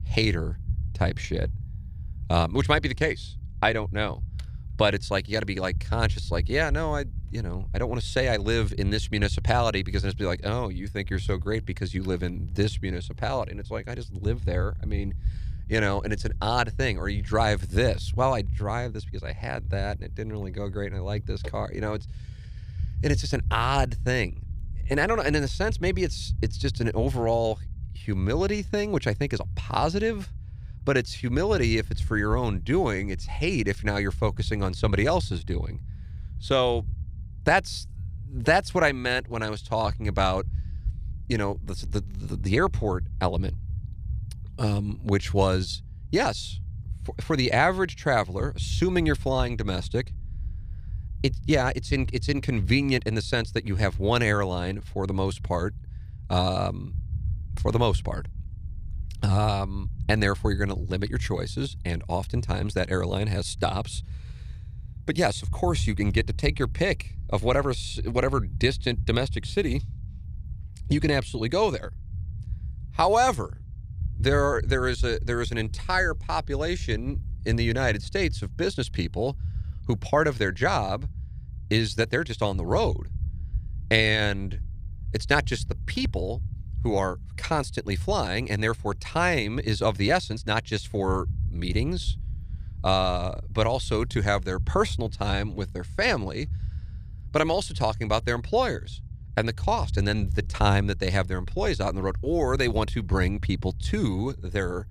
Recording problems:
low rumble; faint; throughout; 25 dB below the speech

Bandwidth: 14.5 kHz